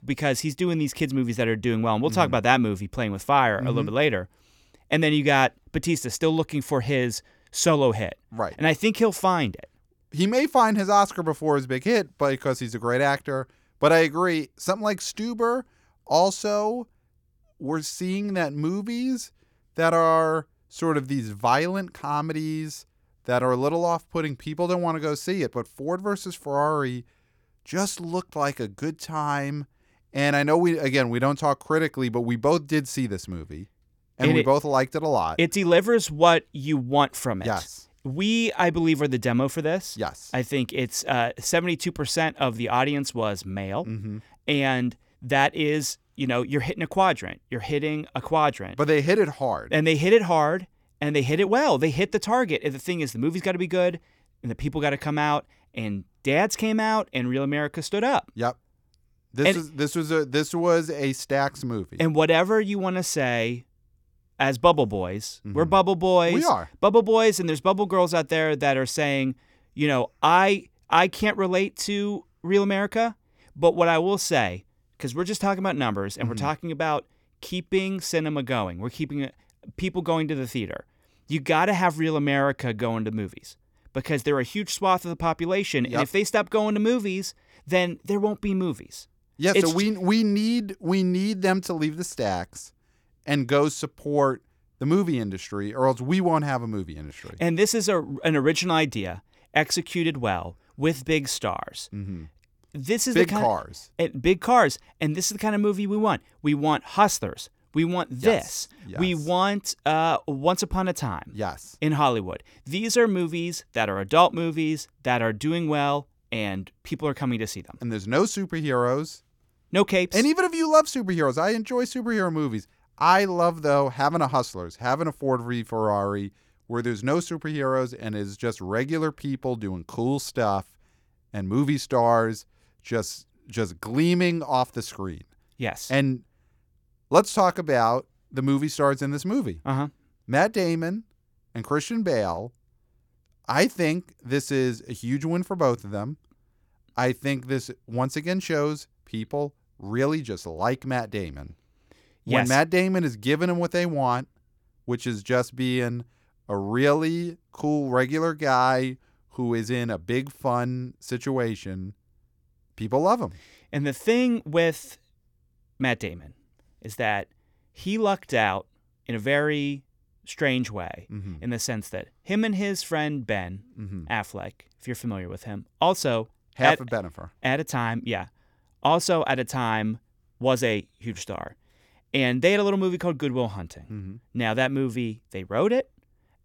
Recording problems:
none

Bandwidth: 18.5 kHz